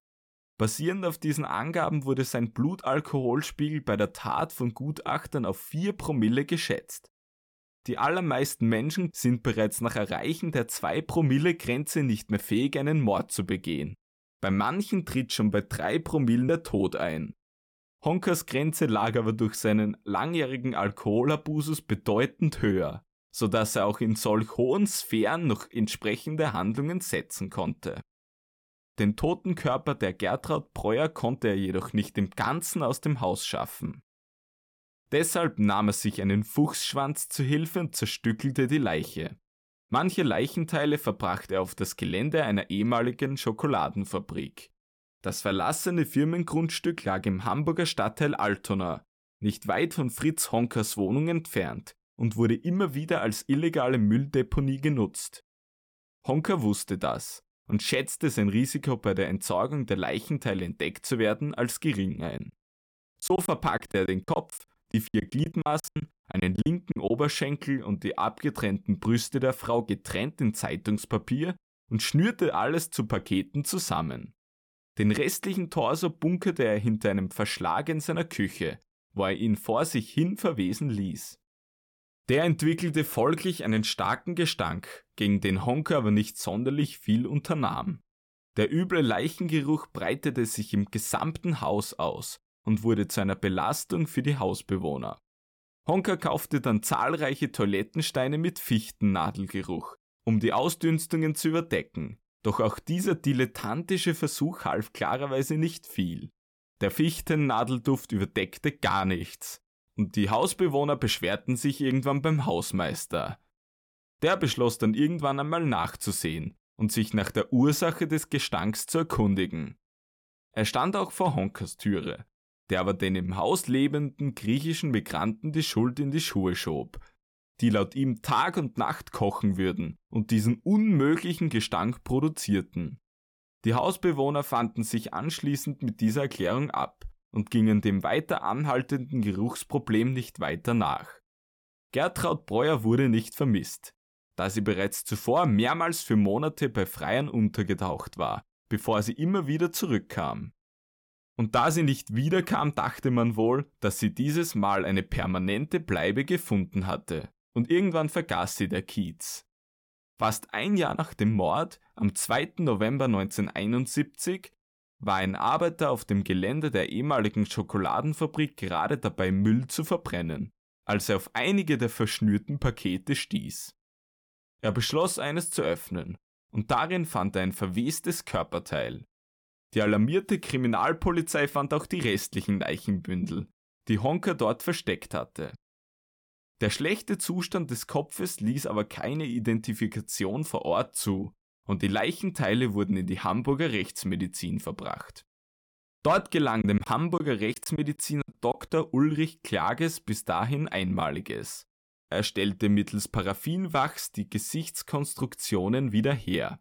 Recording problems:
choppy; very; from 1:02 to 1:07 and from 3:17 to 3:19; 18% of the speech affected

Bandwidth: 18 kHz